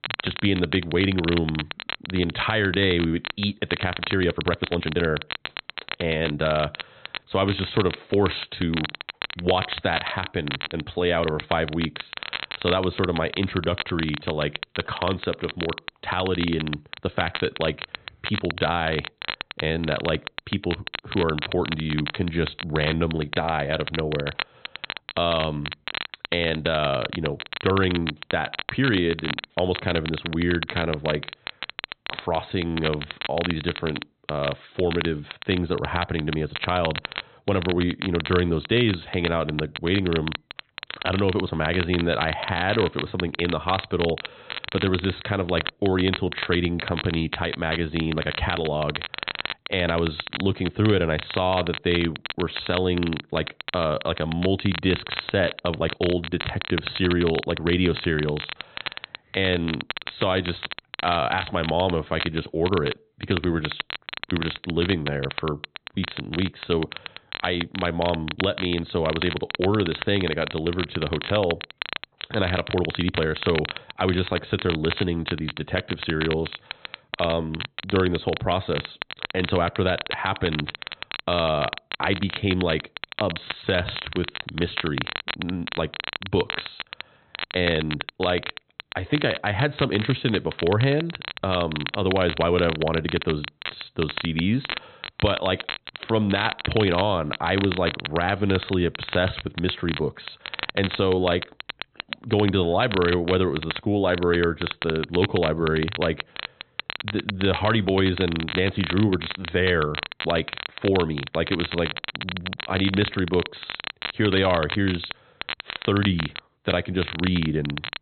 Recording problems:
high frequencies cut off; severe; nothing above 4 kHz
crackle, like an old record; loud; 7 dB below the speech
uneven, jittery; strongly; from 4 s to 1:30

